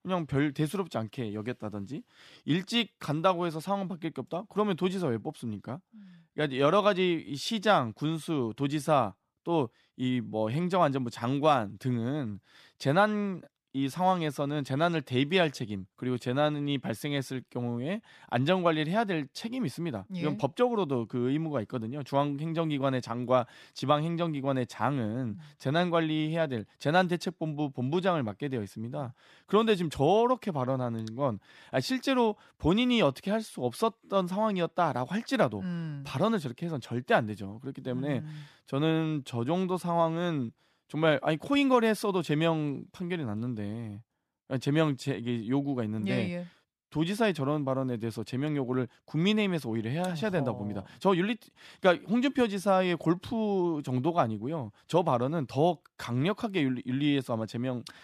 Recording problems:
none

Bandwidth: 14.5 kHz